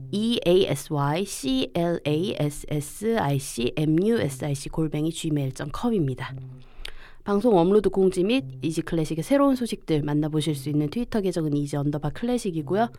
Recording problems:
electrical hum; faint; throughout; 60 Hz, 25 dB below the speech

